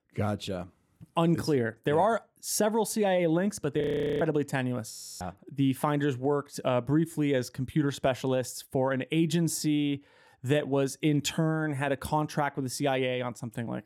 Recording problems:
audio freezing; at 4 s and at 5 s

